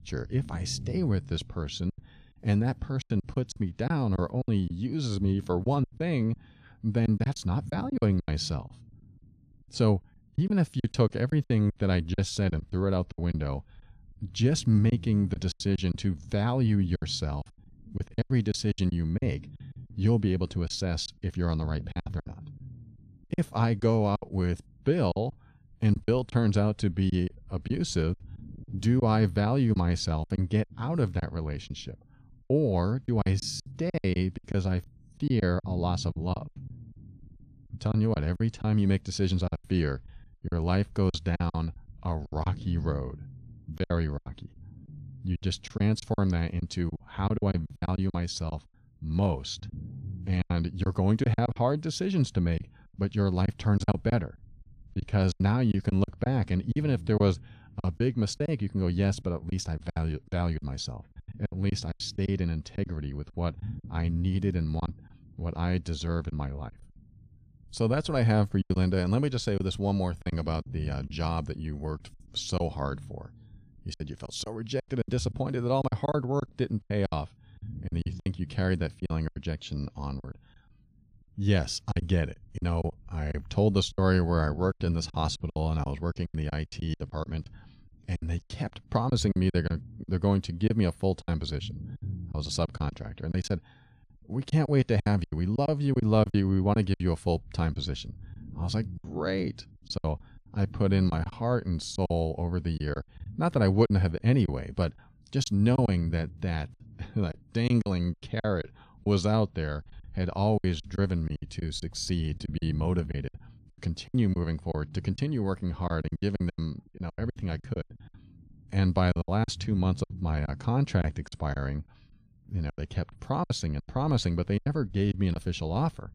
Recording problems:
low rumble; faint; throughout; 25 dB below the speech
choppy; very; 11% of the speech affected

